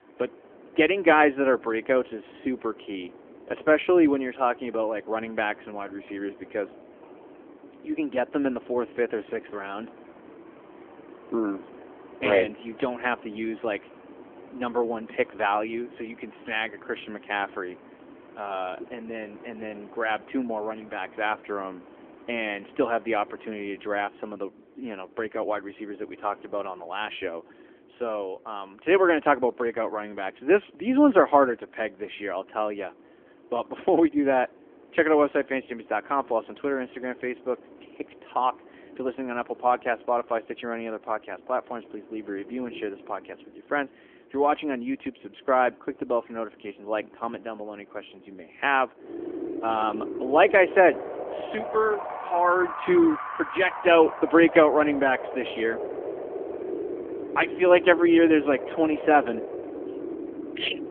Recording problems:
phone-call audio; nothing above 3.5 kHz
wind in the background; noticeable; throughout; 15 dB below the speech

